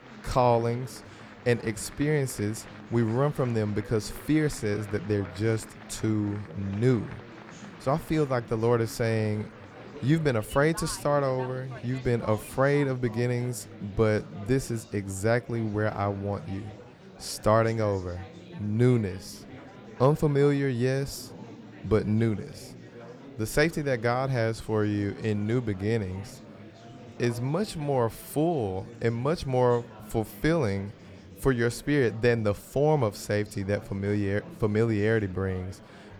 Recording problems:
murmuring crowd; noticeable; throughout; 20 dB below the speech

